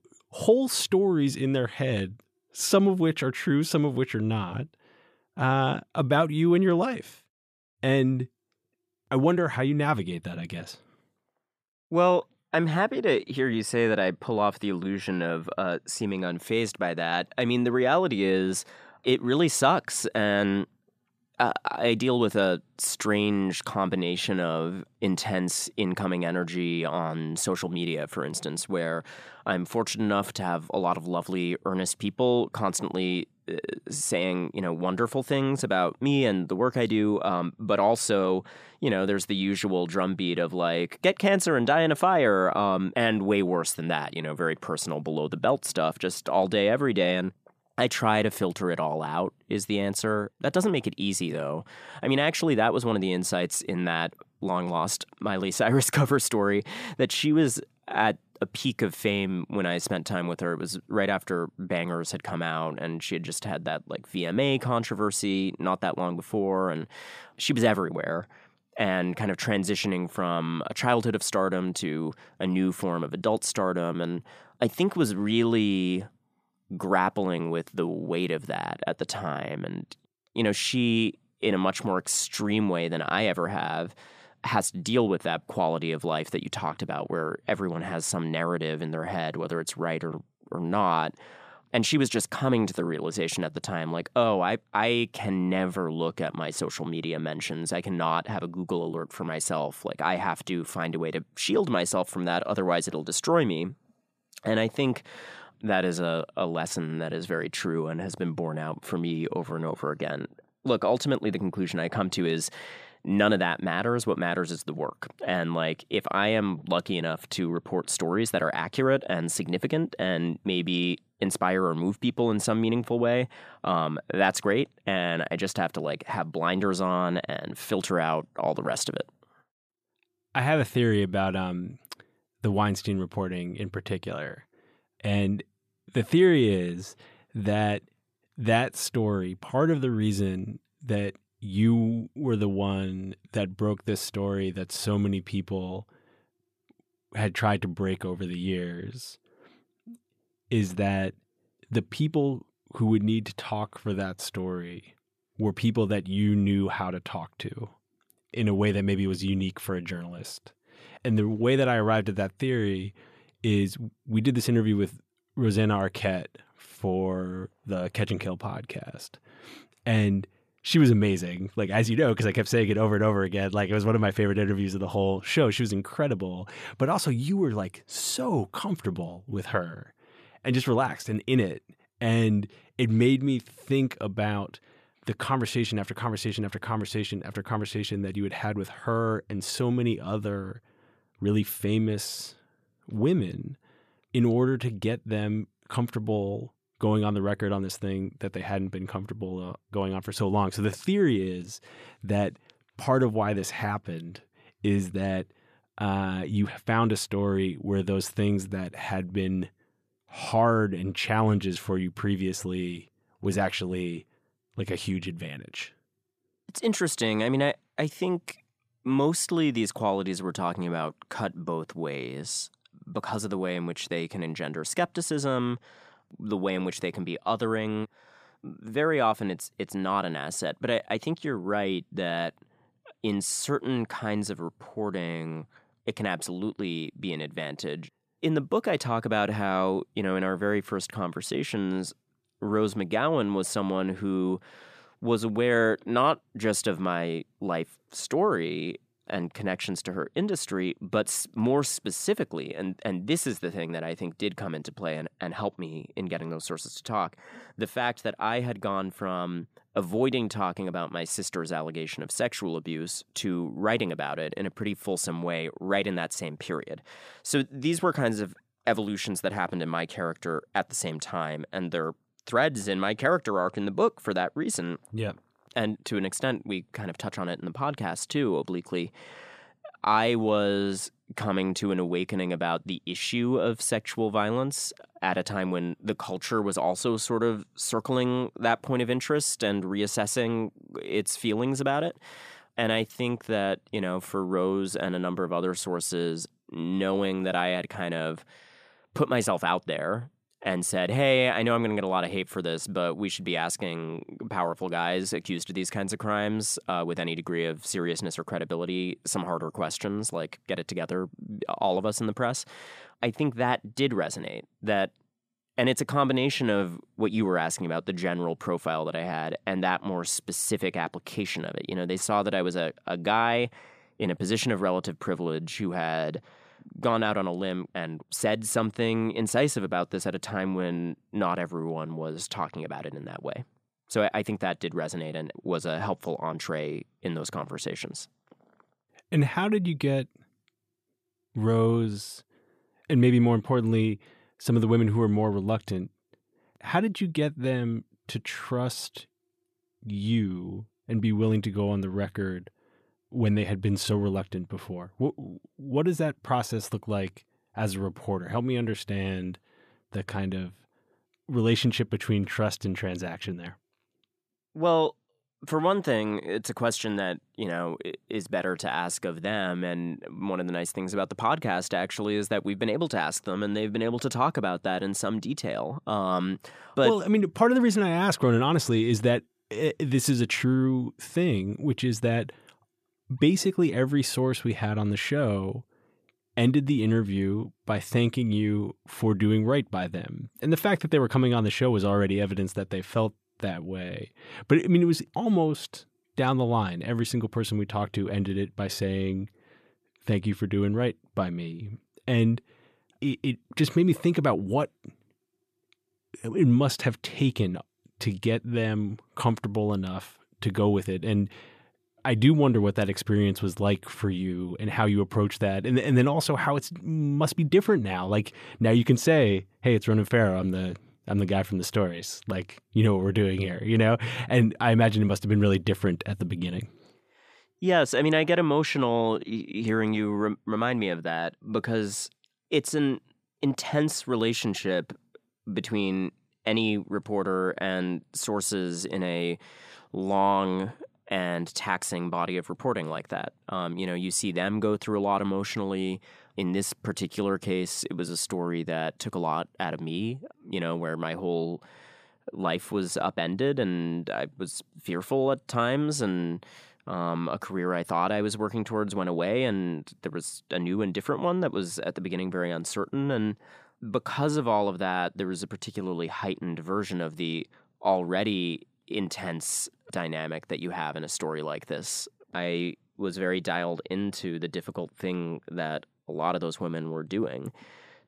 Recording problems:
none

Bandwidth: 14.5 kHz